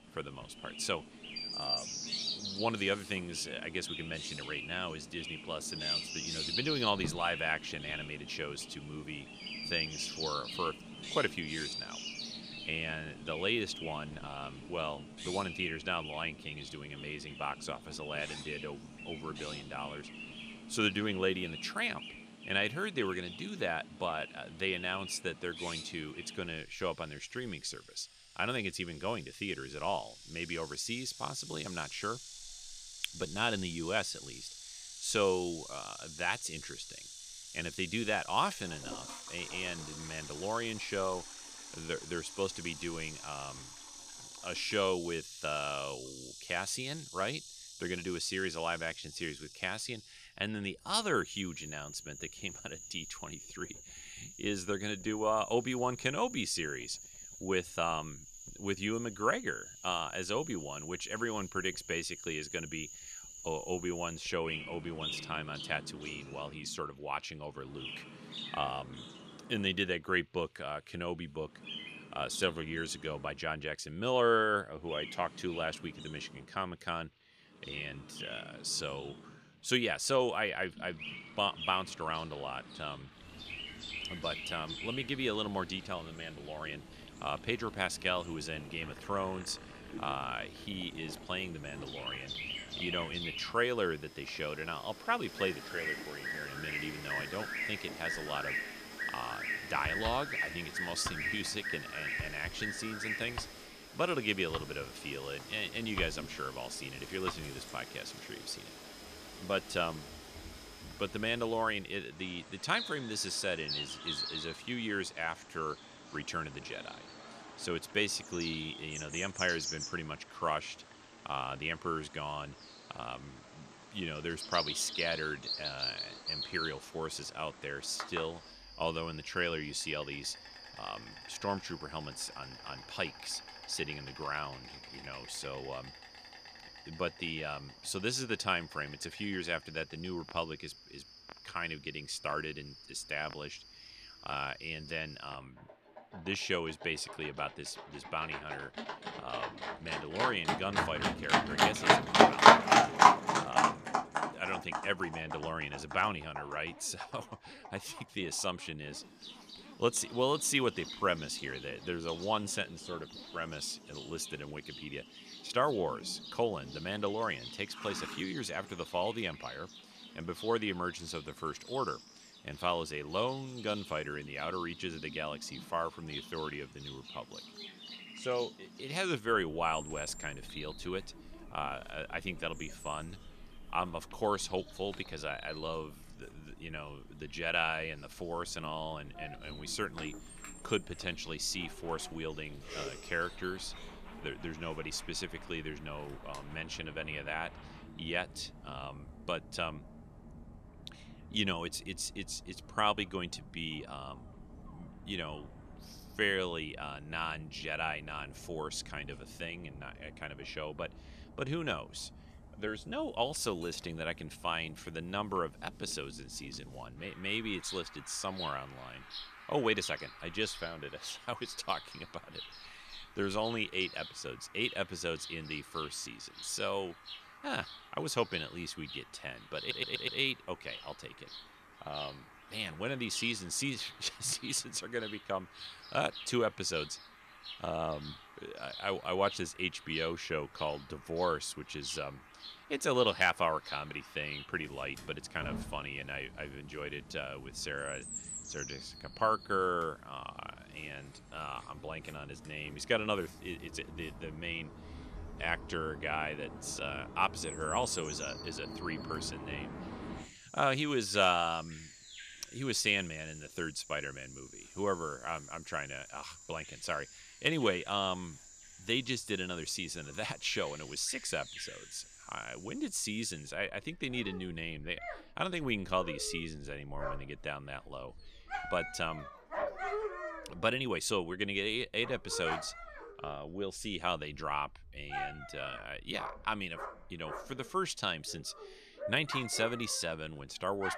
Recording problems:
animal sounds; loud; throughout; 3 dB below the speech
household noises; faint; until 3:26; 20 dB below the speech
audio stuttering; at 3:50

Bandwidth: 14.5 kHz